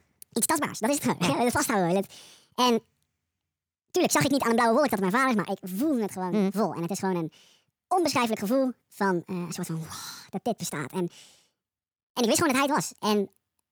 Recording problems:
wrong speed and pitch; too fast and too high; 1.6 times normal speed

